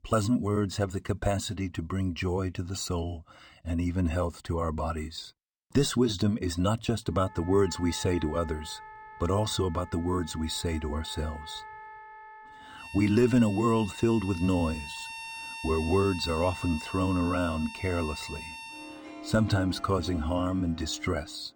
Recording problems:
background music; noticeable; from 7.5 s on; 15 dB below the speech

